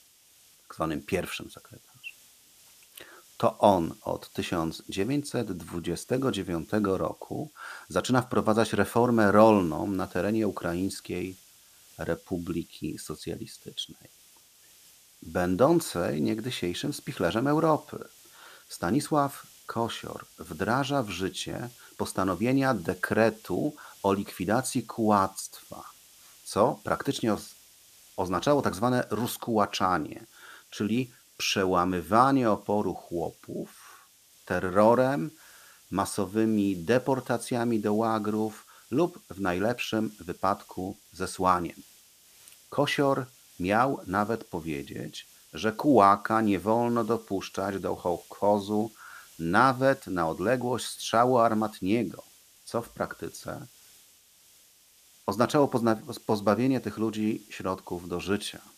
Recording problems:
hiss; faint; throughout; 25 dB below the speech

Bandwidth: 14.5 kHz